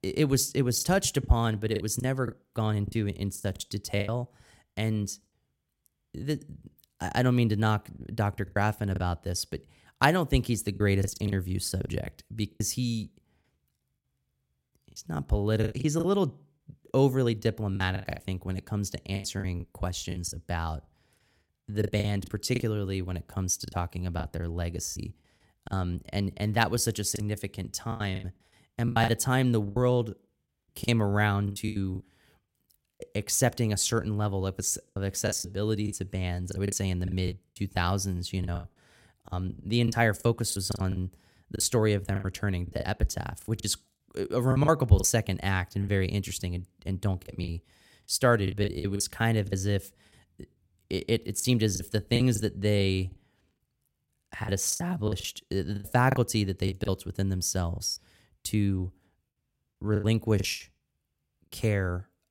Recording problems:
choppy; very; 11% of the speech affected

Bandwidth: 16 kHz